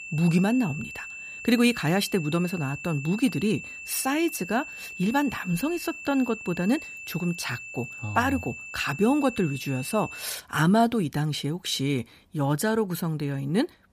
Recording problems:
high-pitched whine; noticeable; until 10 s; 2.5 kHz, 10 dB below the speech

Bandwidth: 15 kHz